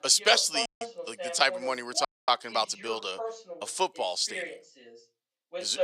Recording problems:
thin; somewhat; fading below 500 Hz
voice in the background; noticeable; throughout; 10 dB below the speech
audio cutting out; at 0.5 s and at 2 s

